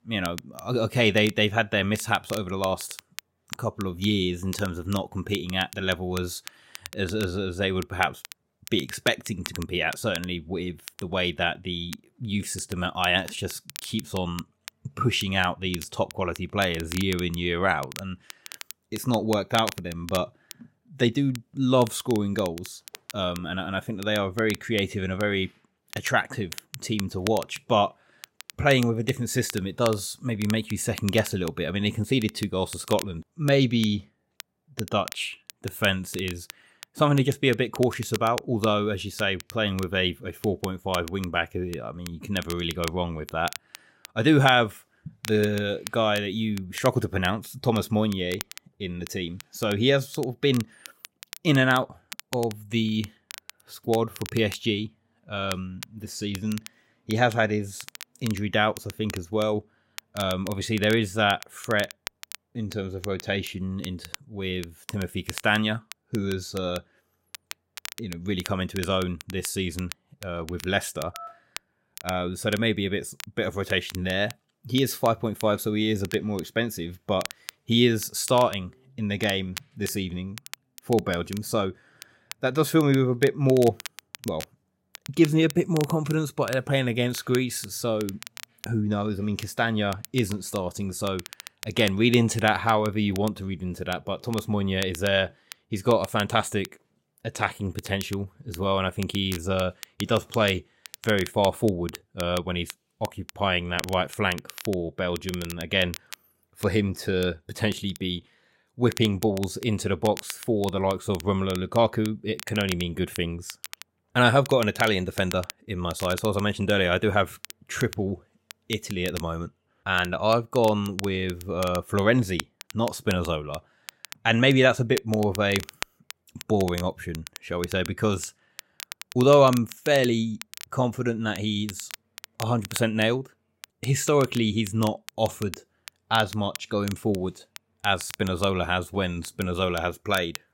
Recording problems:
crackle, like an old record; noticeable; 15 dB below the speech
phone ringing; faint; at 1:11; peak 15 dB below the speech

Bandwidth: 16 kHz